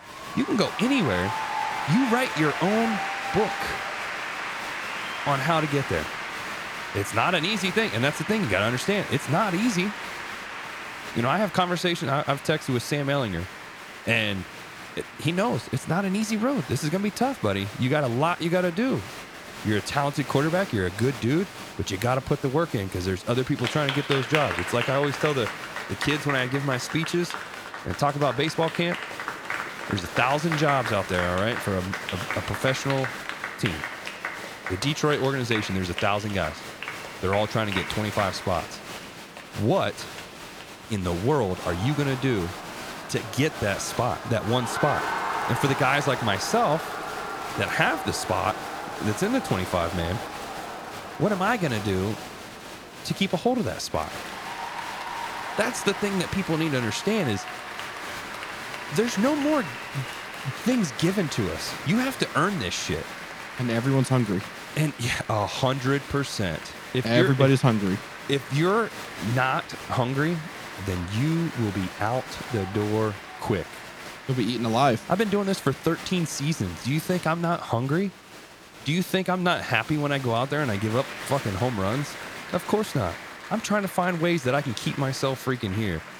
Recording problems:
crowd noise; loud; throughout; 8 dB below the speech

